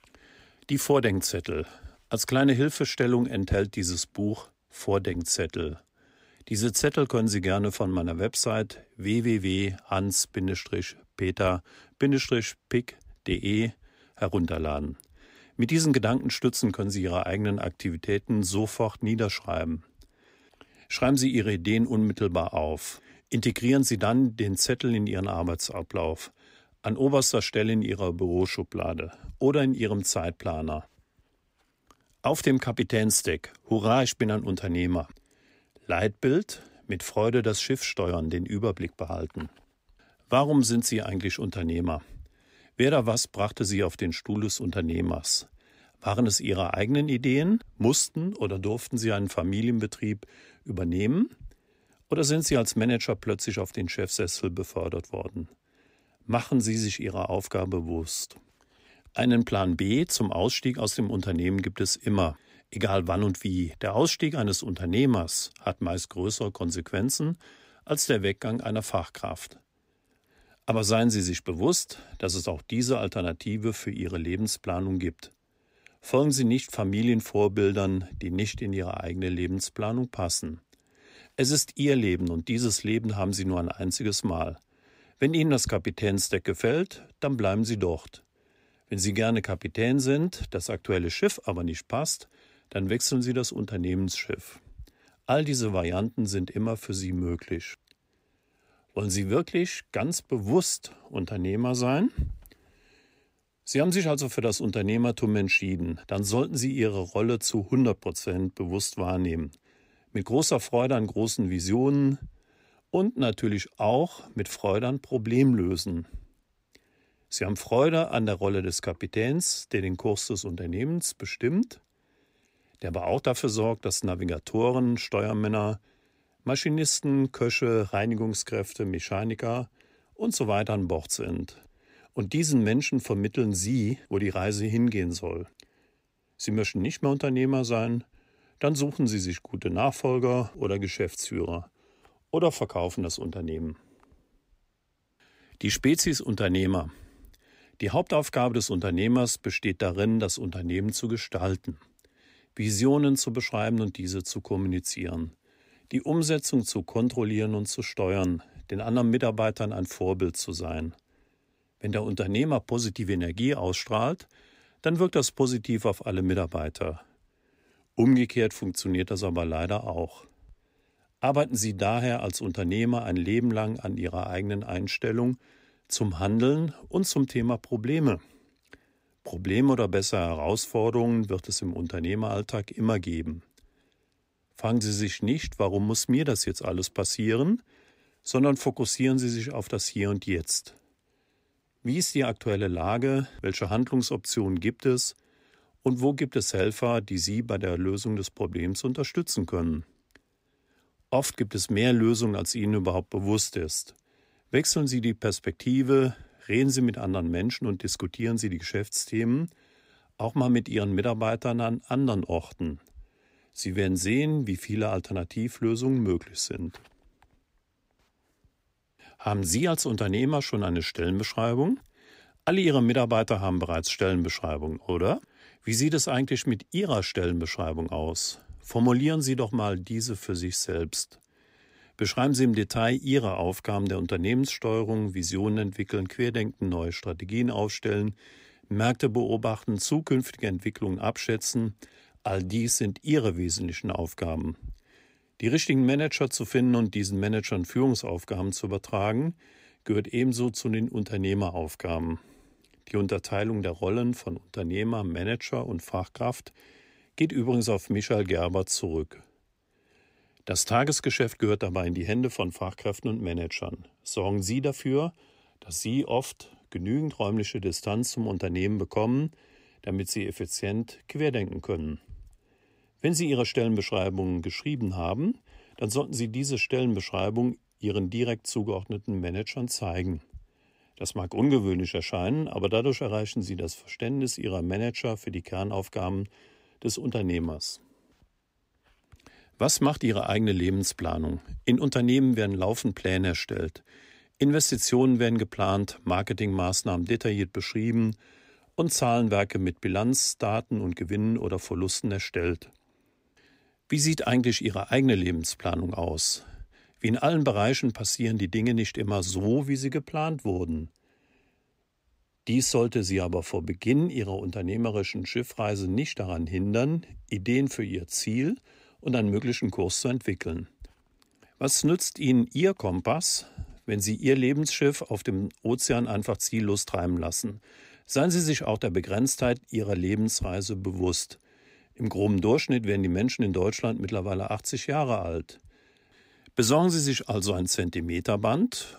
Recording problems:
none

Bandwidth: 15.5 kHz